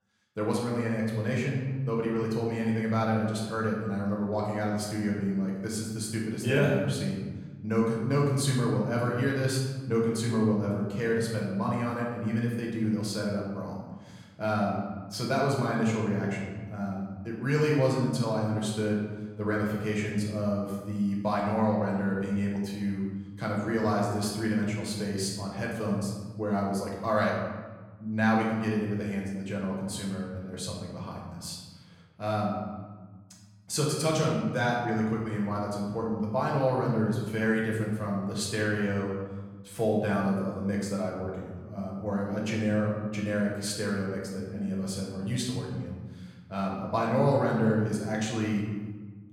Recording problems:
off-mic speech; far
room echo; noticeable; dies away in 1.3 s

